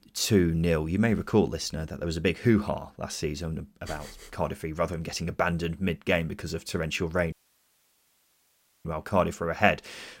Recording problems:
audio cutting out; at 7.5 s for 1.5 s

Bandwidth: 16 kHz